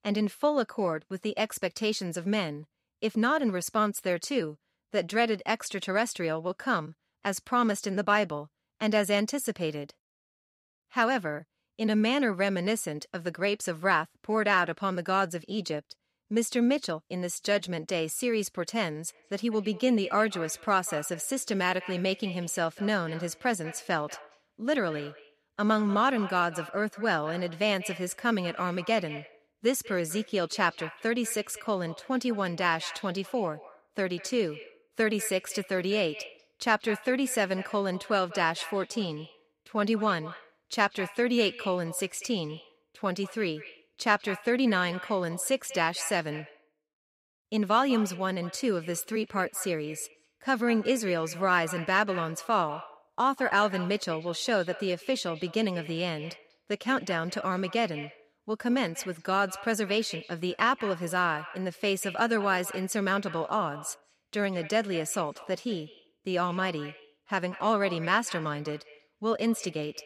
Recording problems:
echo of what is said; noticeable; from 19 s on; 190 ms later, 15 dB below the speech

